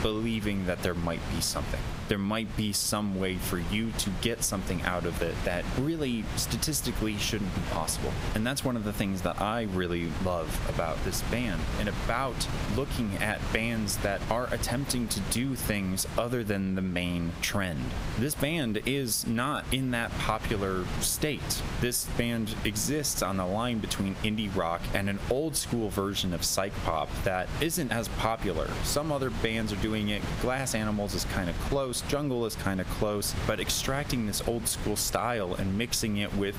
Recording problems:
squashed, flat; somewhat
wind noise on the microphone; heavy; 10 dB below the speech

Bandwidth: 15.5 kHz